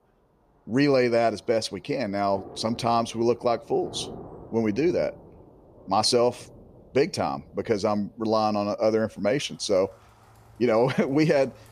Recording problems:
rain or running water; faint; throughout; 20 dB below the speech

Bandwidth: 15 kHz